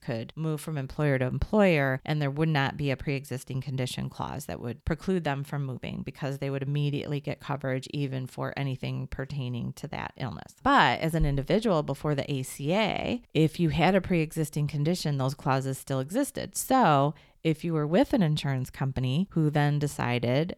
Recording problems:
none

